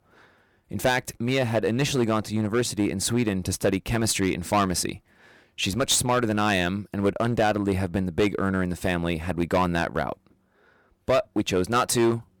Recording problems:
distortion; slight; 6% of the sound clipped

